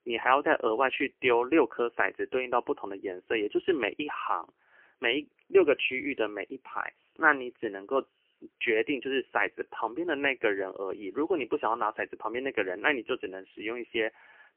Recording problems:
phone-call audio; poor line; nothing above 3 kHz

